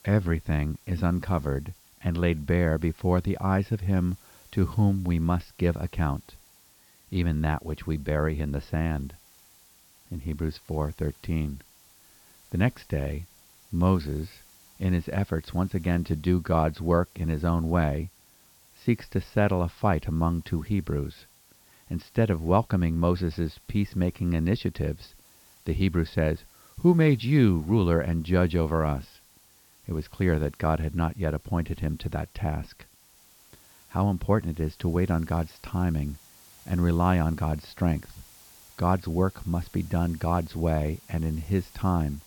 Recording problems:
high frequencies cut off; noticeable; nothing above 5.5 kHz
hiss; faint; throughout; 25 dB below the speech

